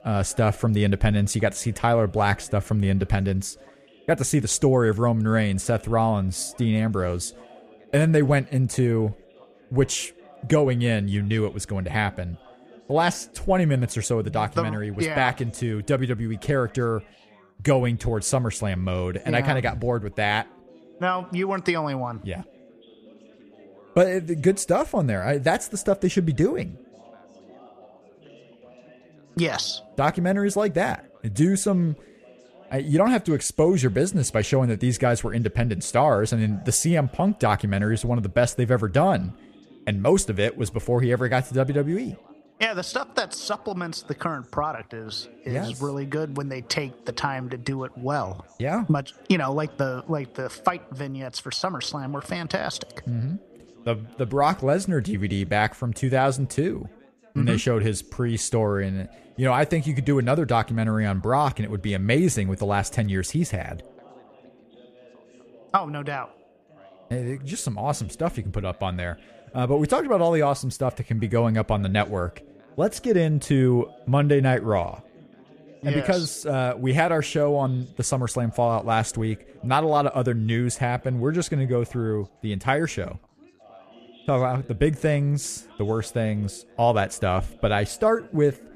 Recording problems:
background chatter; faint; throughout; 3 voices, 25 dB below the speech

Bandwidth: 14.5 kHz